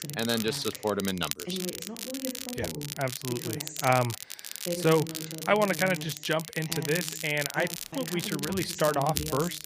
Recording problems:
voice in the background; loud; throughout; 10 dB below the speech
crackle, like an old record; loud; 7 dB below the speech
audio cutting out; at 8 s

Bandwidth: 15 kHz